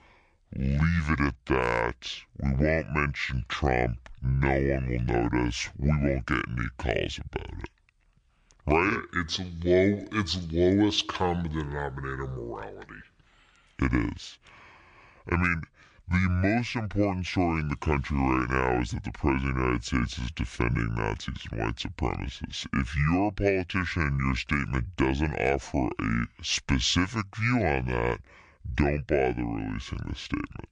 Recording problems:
wrong speed and pitch; too slow and too low; 0.7 times normal speed

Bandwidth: 10 kHz